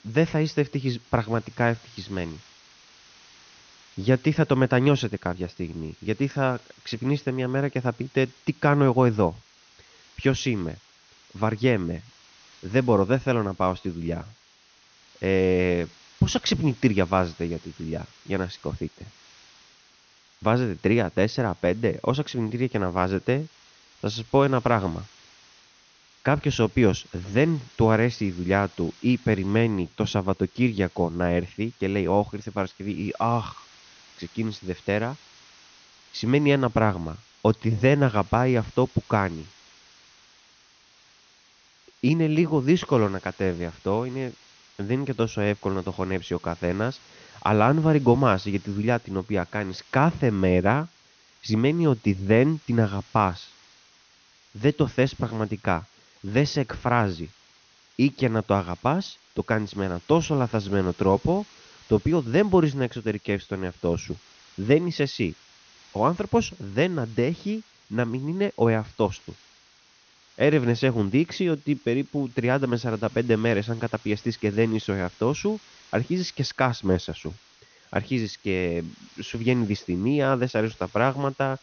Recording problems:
high frequencies cut off; noticeable; nothing above 6.5 kHz
hiss; faint; throughout; 25 dB below the speech

